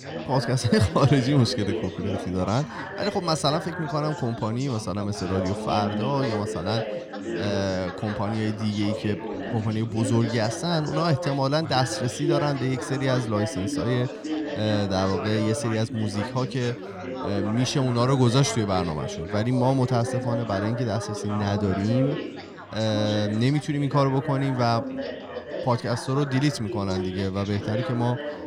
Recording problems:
background chatter; loud; throughout; 4 voices, 7 dB below the speech

